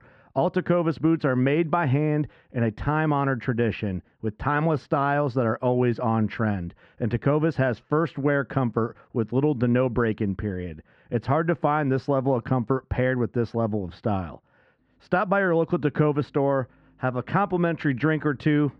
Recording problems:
muffled; very; fading above 2 kHz

